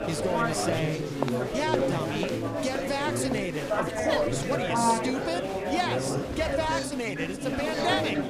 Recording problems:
chatter from many people; very loud; throughout; 2 dB above the speech

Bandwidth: 15 kHz